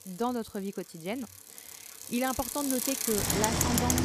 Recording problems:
traffic noise; very loud; throughout; 4 dB above the speech

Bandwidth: 15 kHz